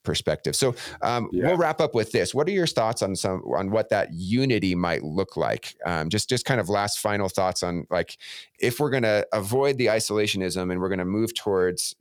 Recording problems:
none

